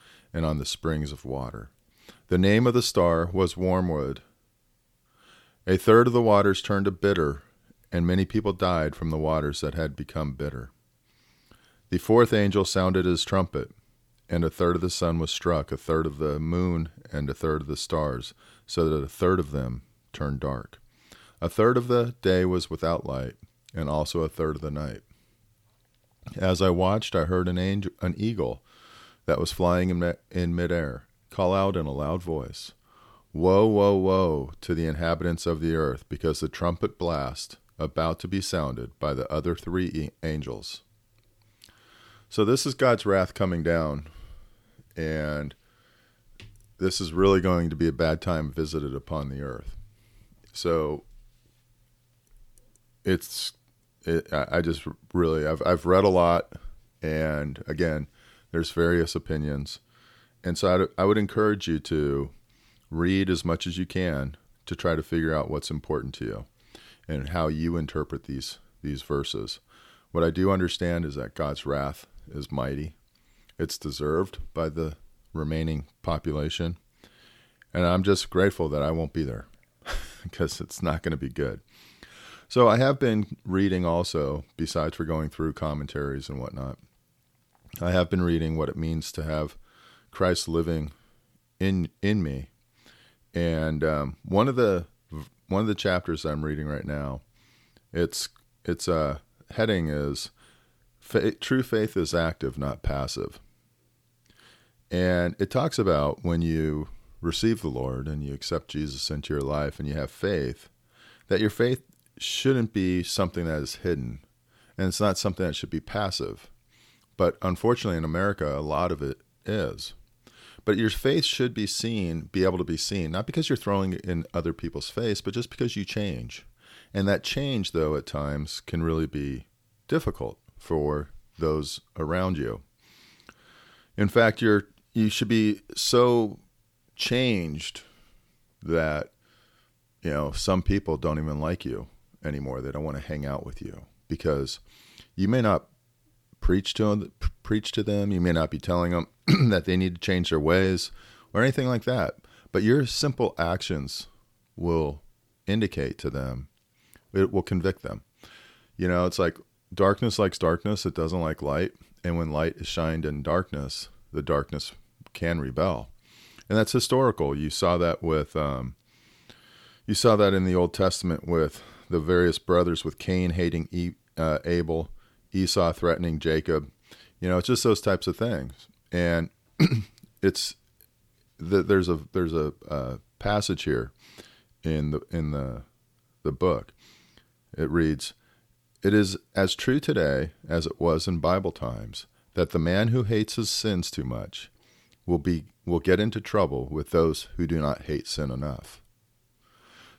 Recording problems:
none

